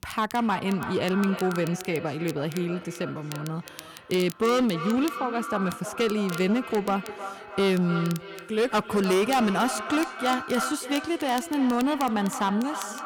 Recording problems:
echo of what is said; strong; throughout; 310 ms later, 9 dB below the speech
distortion; slight; 7% of the sound clipped
crackle, like an old record; noticeable; 20 dB below the speech

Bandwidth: 17.5 kHz